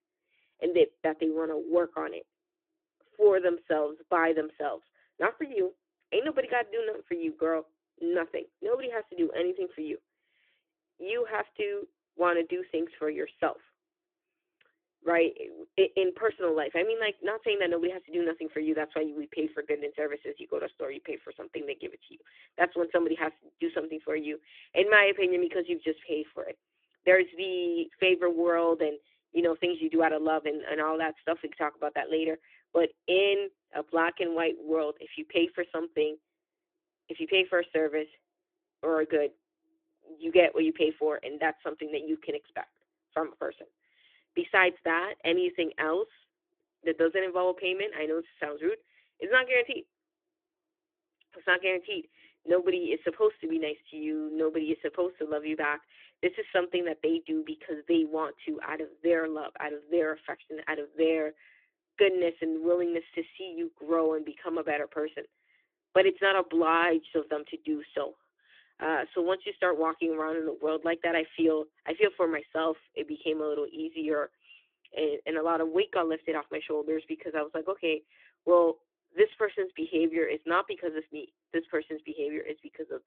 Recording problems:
phone-call audio

